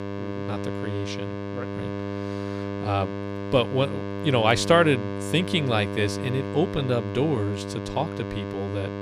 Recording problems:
electrical hum; loud; throughout; 50 Hz, 8 dB below the speech

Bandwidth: 14.5 kHz